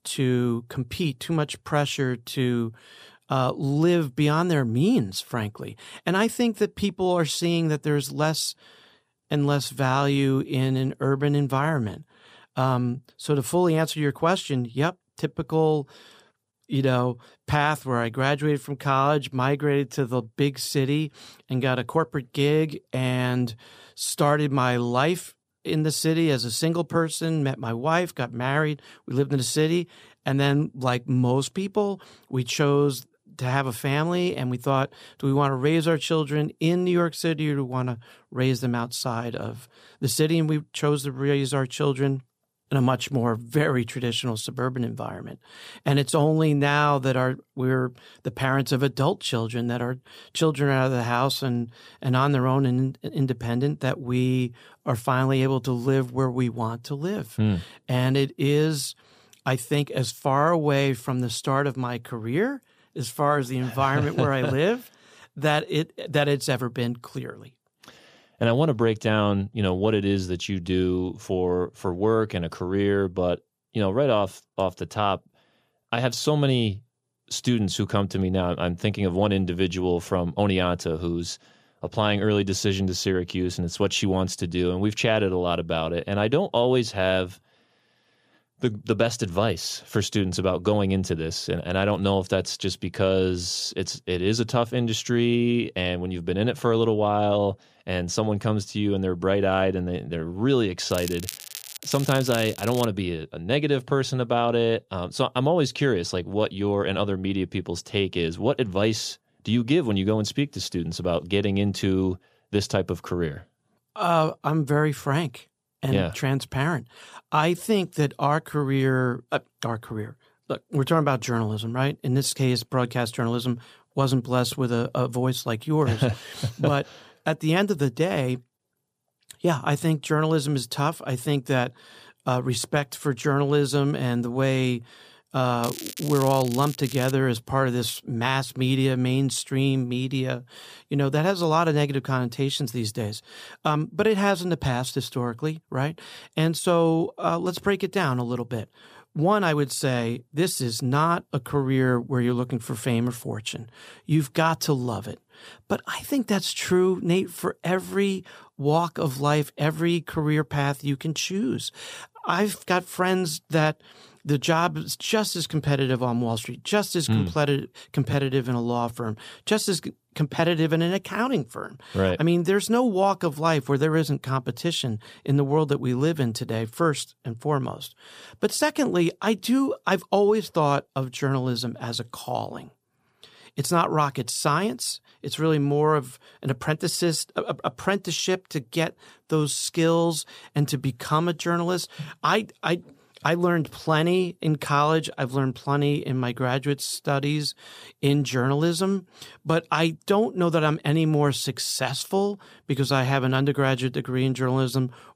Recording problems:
crackling; noticeable; from 1:41 to 1:43 and from 2:16 to 2:17; 10 dB below the speech

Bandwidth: 15 kHz